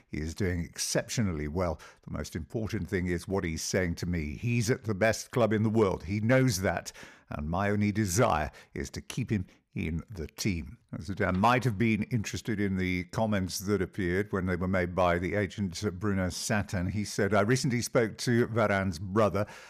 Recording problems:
none

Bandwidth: 14.5 kHz